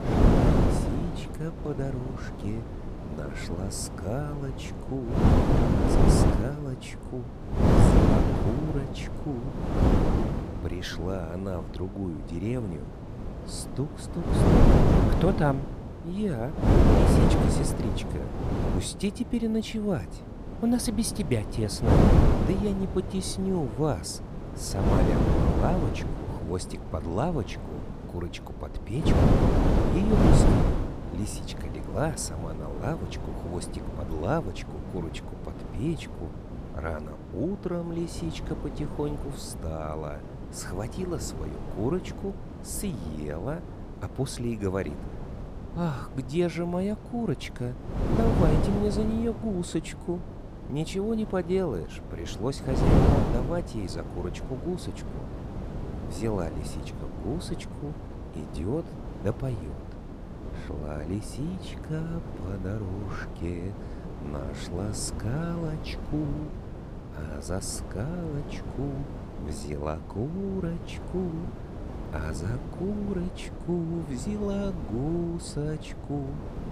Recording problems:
wind noise on the microphone; heavy; 2 dB above the speech

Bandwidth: 14.5 kHz